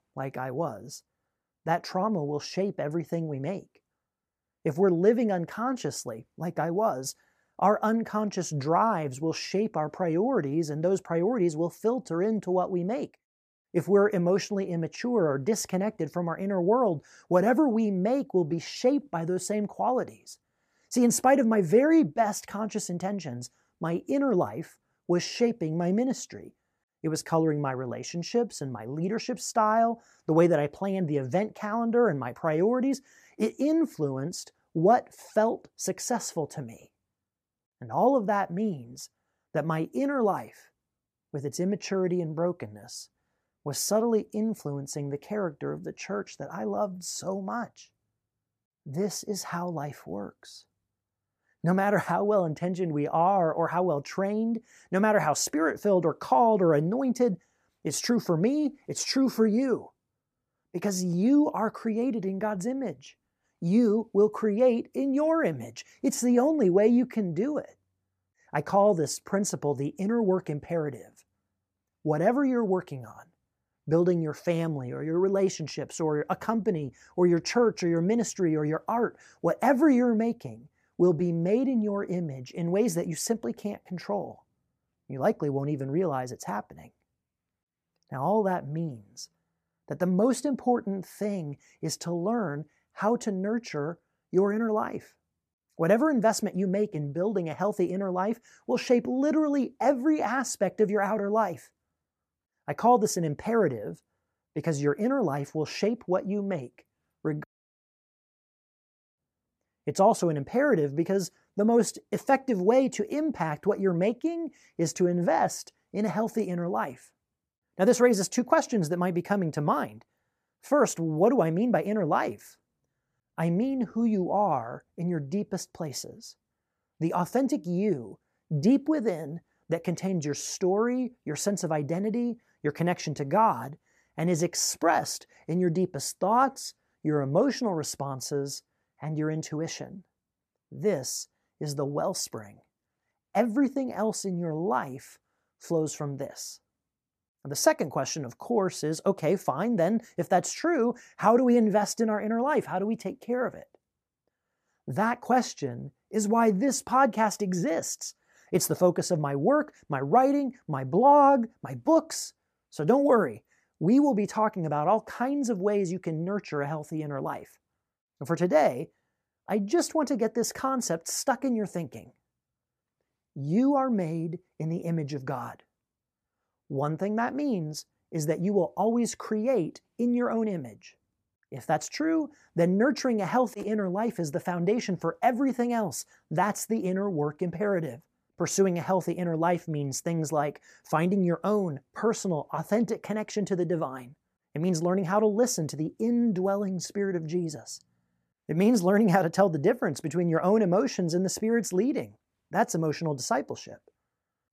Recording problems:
audio cutting out; at 1:48 for 1.5 s

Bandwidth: 14.5 kHz